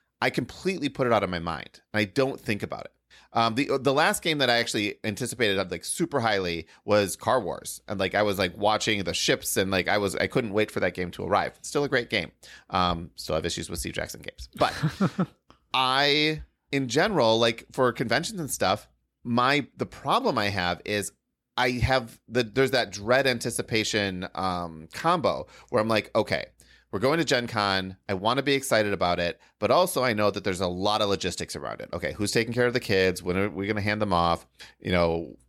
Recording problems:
none

